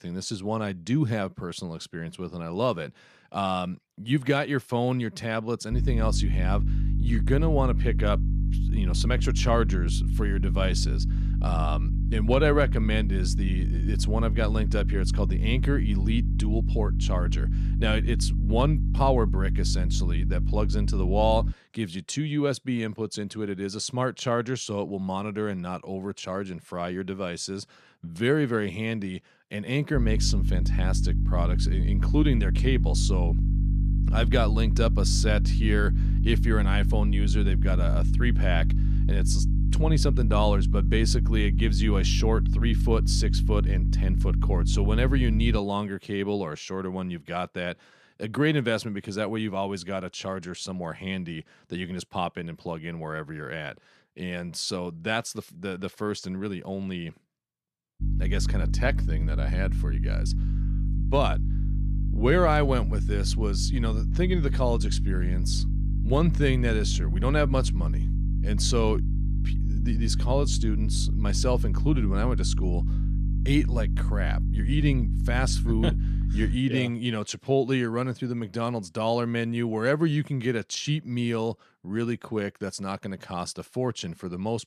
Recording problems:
electrical hum; noticeable; from 5.5 to 22 s, from 30 to 46 s and from 58 s to 1:17; 50 Hz, 10 dB below the speech

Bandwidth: 14.5 kHz